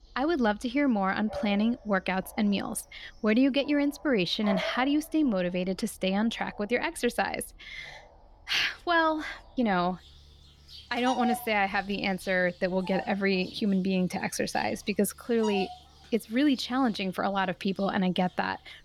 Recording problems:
animal sounds; noticeable; throughout; 15 dB below the speech

